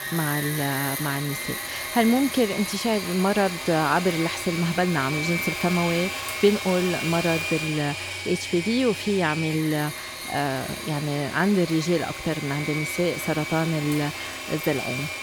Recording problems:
machinery noise; loud; throughout; 5 dB below the speech

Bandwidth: 18 kHz